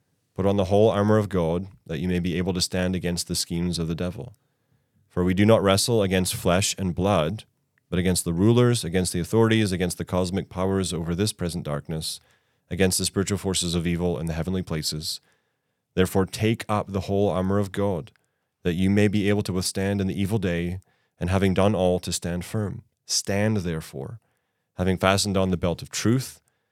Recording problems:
none

